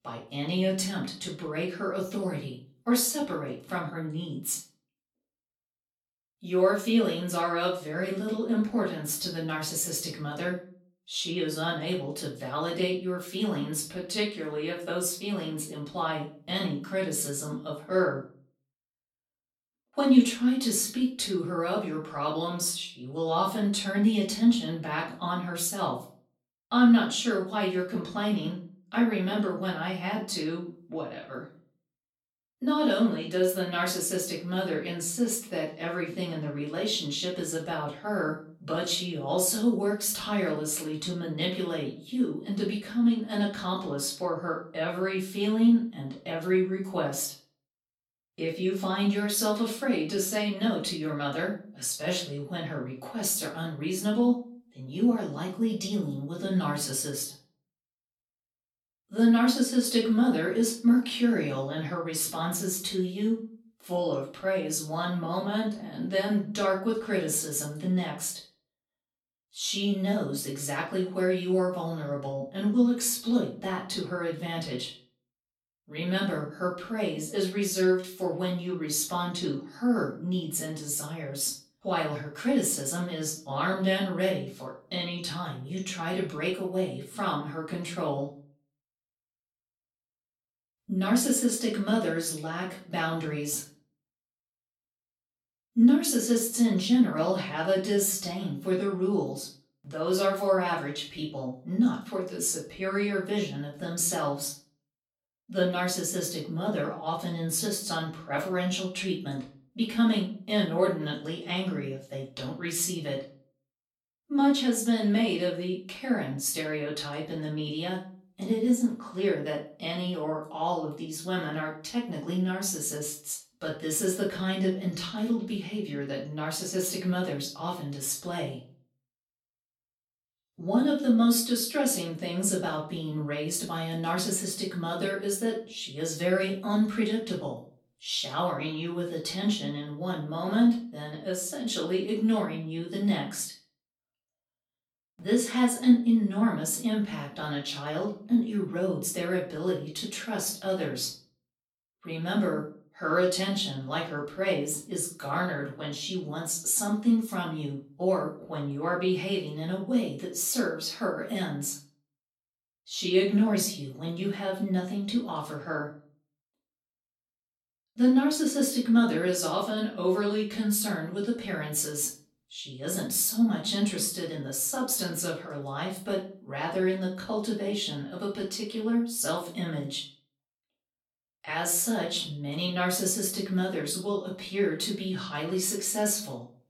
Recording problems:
off-mic speech; far
room echo; slight; dies away in 0.3 s

